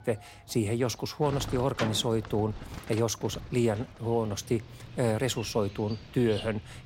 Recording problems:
animal sounds; noticeable; throughout; 10 dB below the speech

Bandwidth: 16 kHz